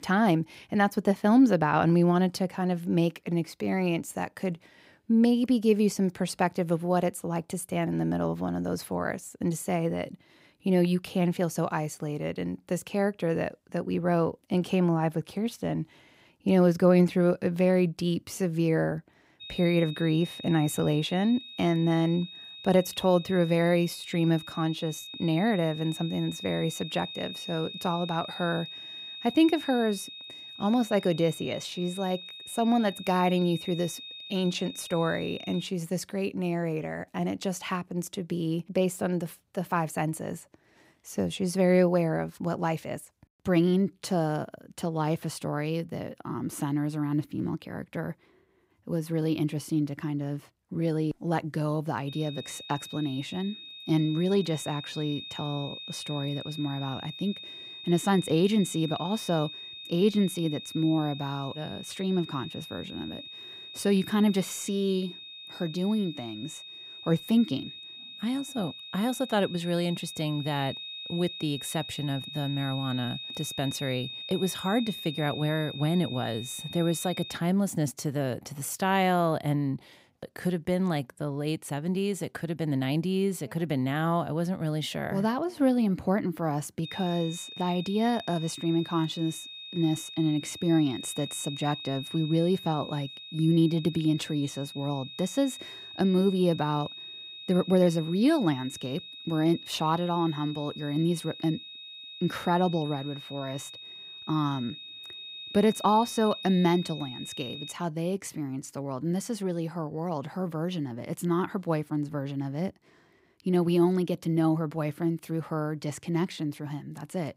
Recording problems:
high-pitched whine; noticeable; from 19 to 36 s, from 52 s to 1:17 and from 1:27 to 1:48; 3.5 kHz, 10 dB below the speech

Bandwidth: 15.5 kHz